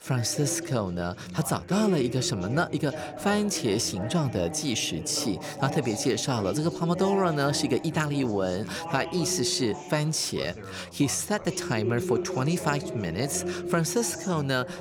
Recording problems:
background chatter; loud; throughout; 4 voices, 9 dB below the speech

